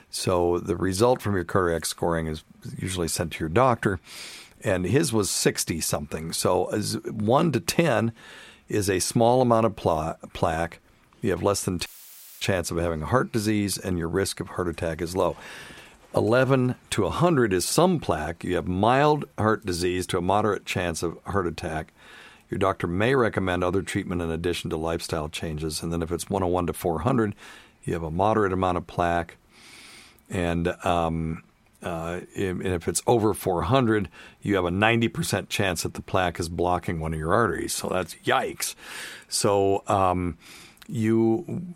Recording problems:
audio cutting out; filled with static; at 12 s for 0.5 s

